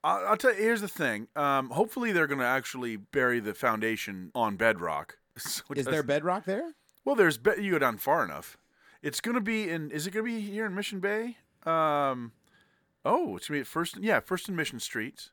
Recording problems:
none

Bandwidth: 18.5 kHz